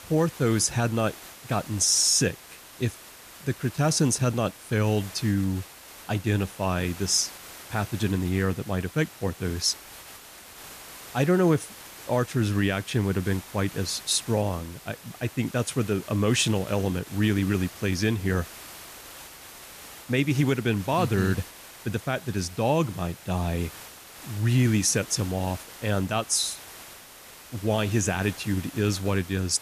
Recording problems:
hiss; noticeable; throughout; 15 dB below the speech

